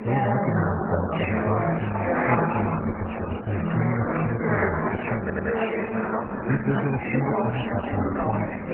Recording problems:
garbled, watery; badly; nothing above 3 kHz
chatter from many people; very loud; throughout; 4 dB above the speech
audio stuttering; at 5 s

